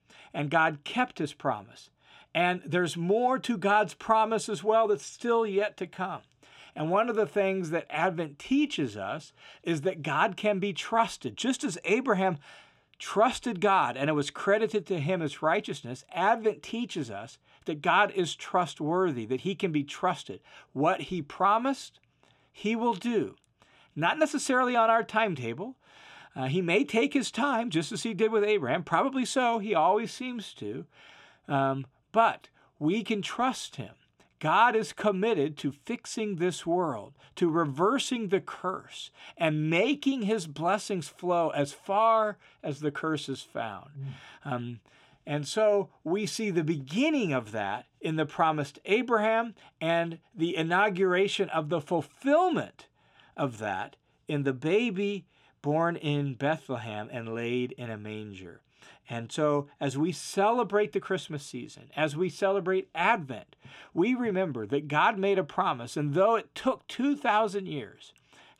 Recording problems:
none

